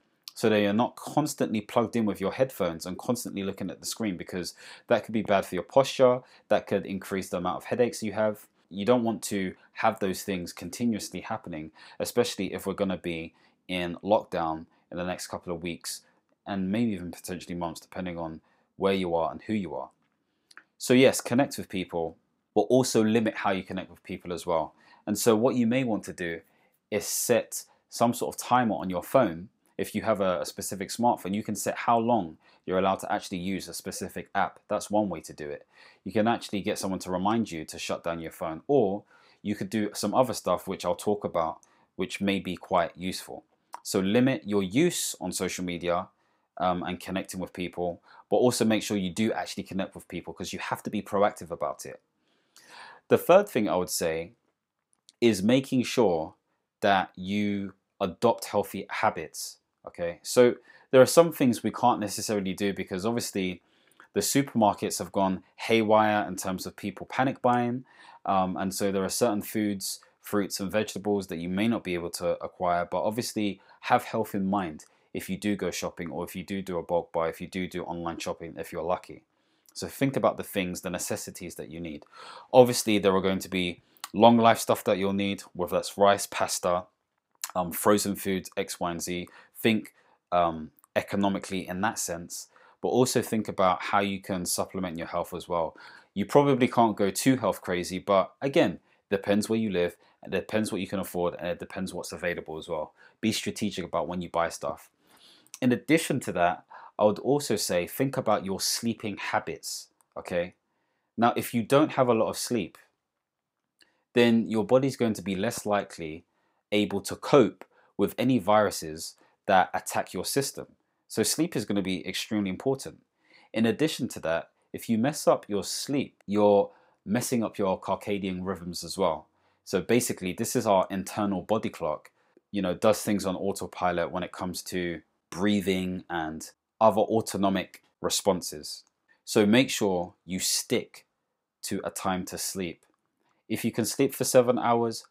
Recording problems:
none

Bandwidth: 15.5 kHz